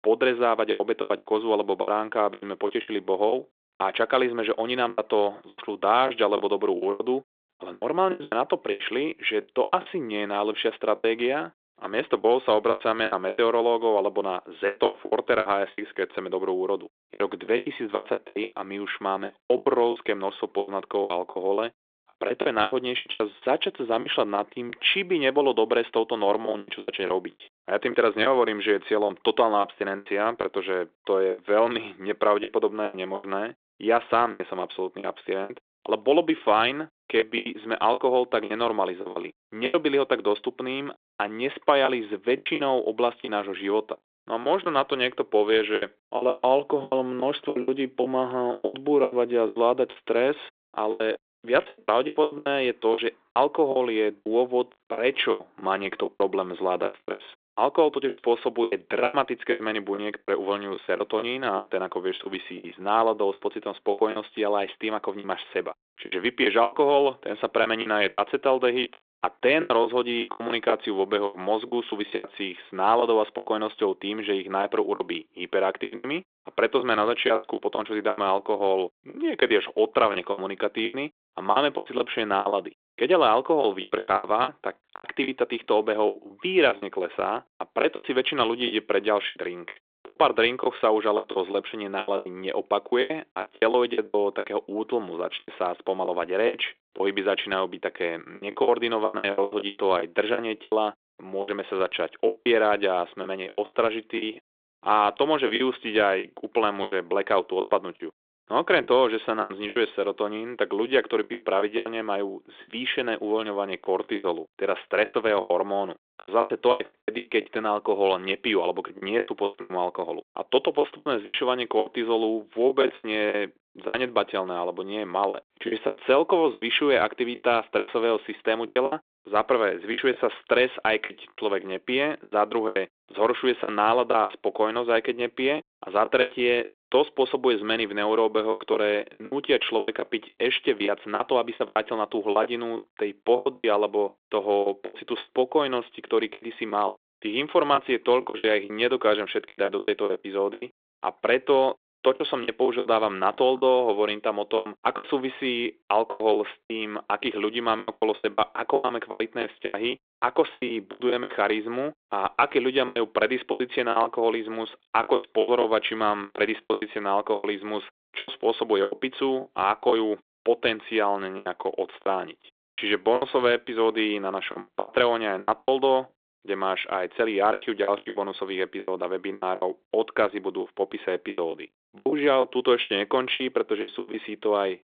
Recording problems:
phone-call audio; nothing above 3.5 kHz
choppy; very; 13% of the speech affected

